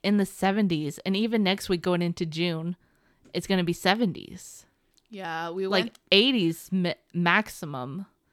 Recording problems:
none

